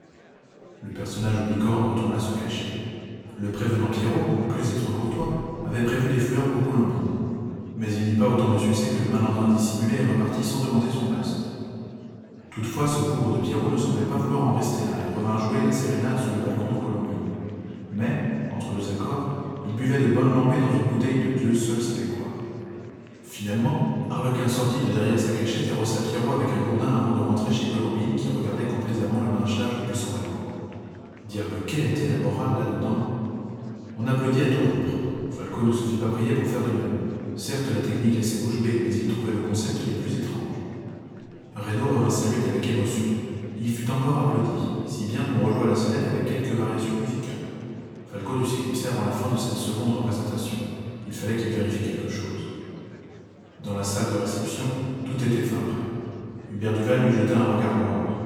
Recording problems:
room echo; strong; dies away in 2.5 s
off-mic speech; far
murmuring crowd; faint; throughout; 25 dB below the speech

